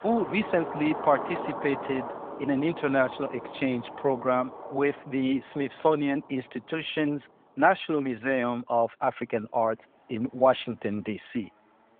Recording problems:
phone-call audio; nothing above 3.5 kHz
traffic noise; noticeable; throughout; 10 dB below the speech

